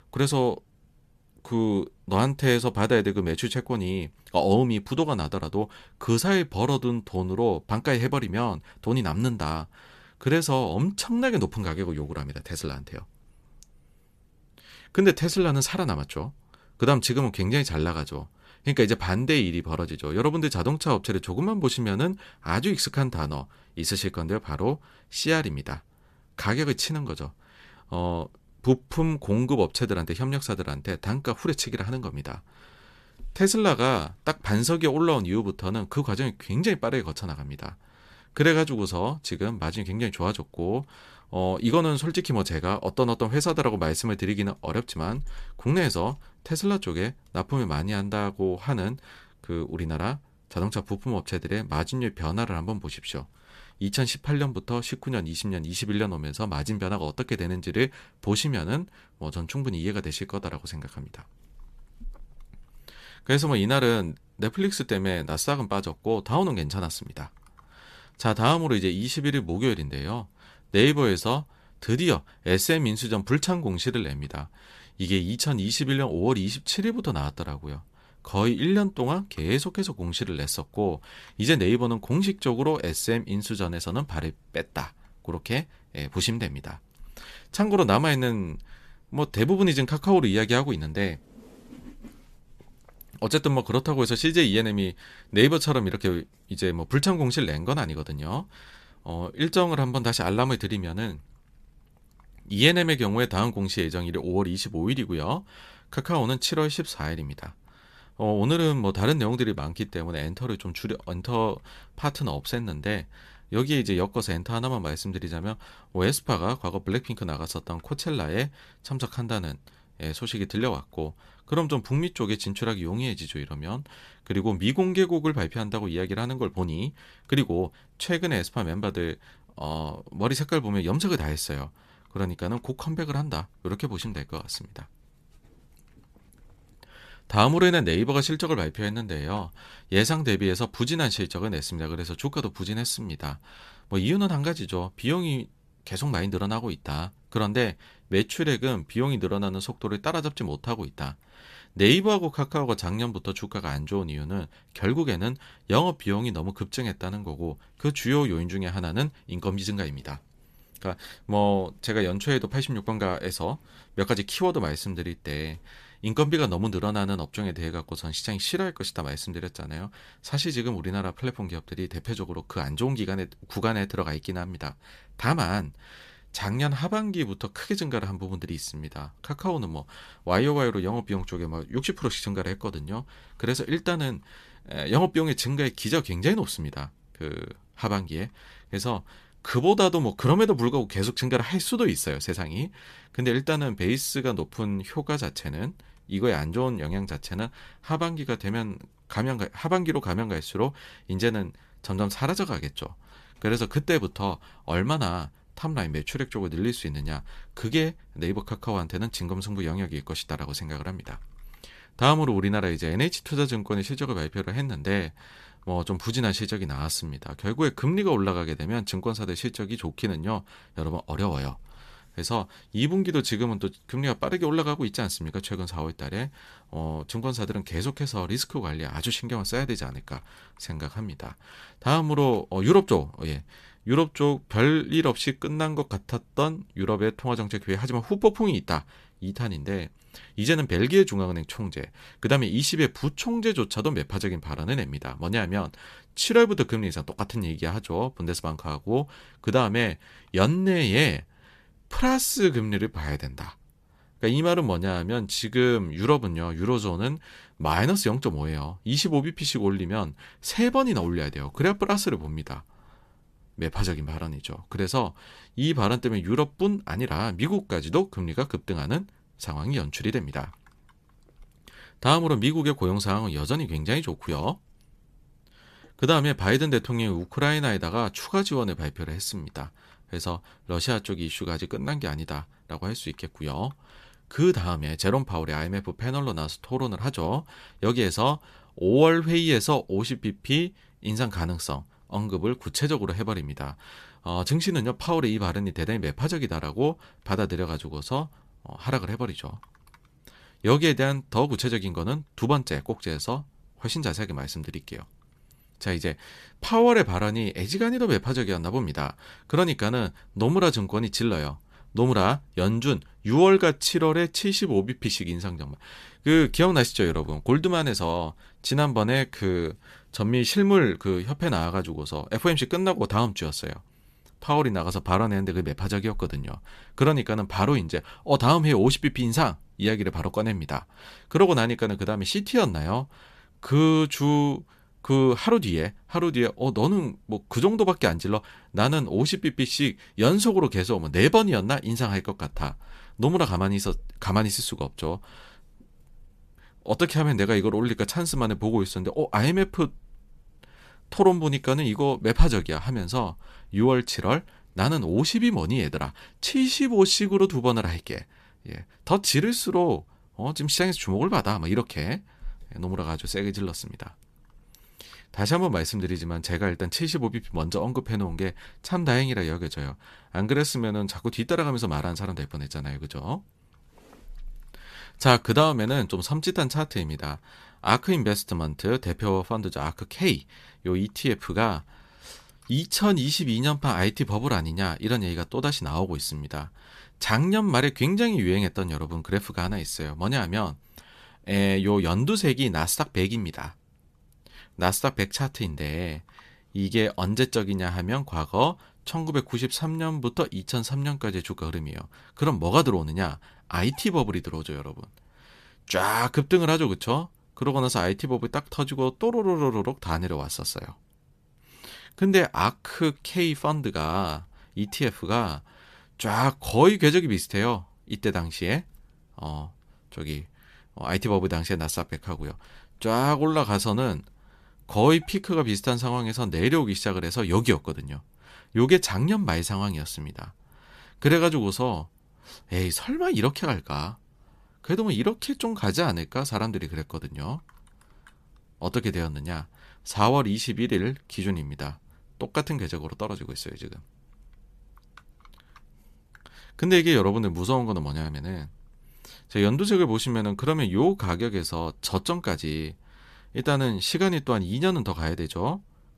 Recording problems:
none

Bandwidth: 14.5 kHz